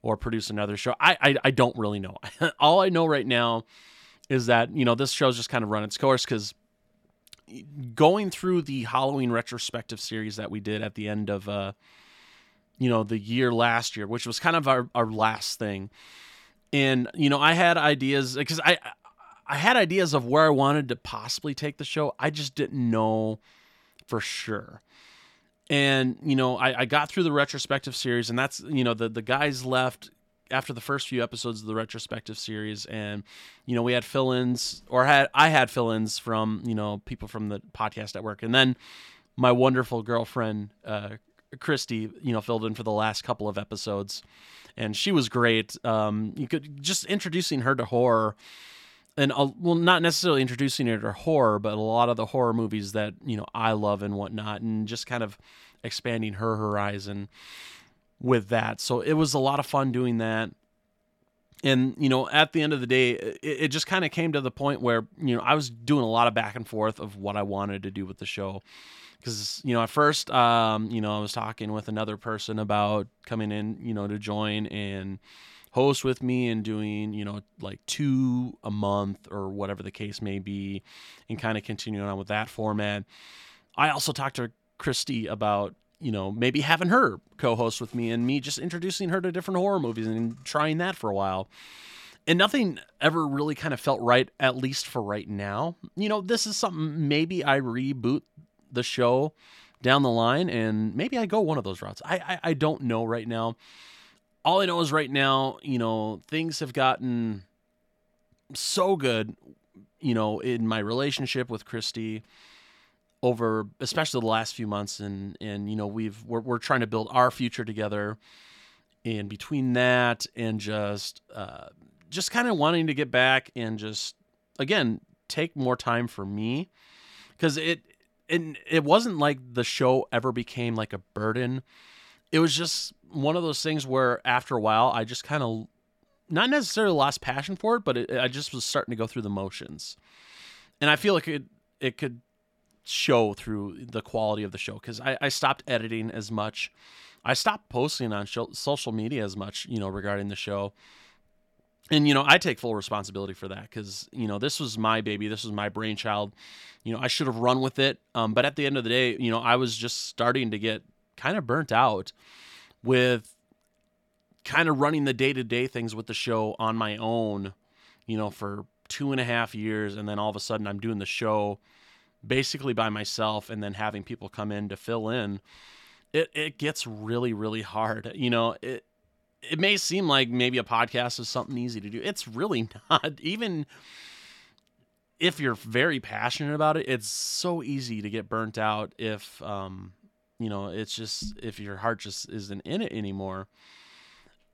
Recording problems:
none

